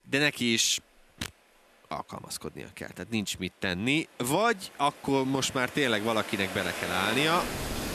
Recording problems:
rain or running water; loud; throughout; 8 dB below the speech

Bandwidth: 14.5 kHz